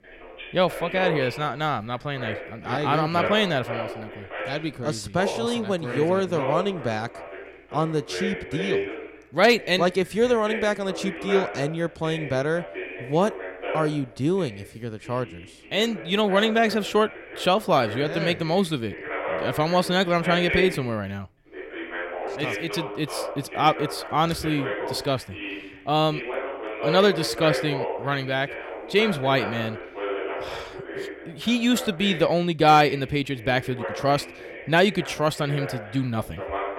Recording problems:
voice in the background; loud; throughout; 9 dB below the speech

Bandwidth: 16.5 kHz